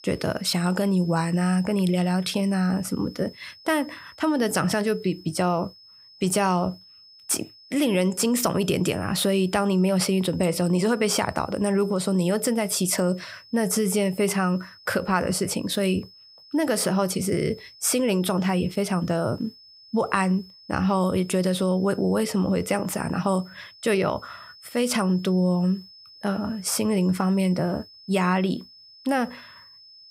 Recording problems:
high-pitched whine; faint; throughout; 5 kHz, 25 dB below the speech

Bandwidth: 15.5 kHz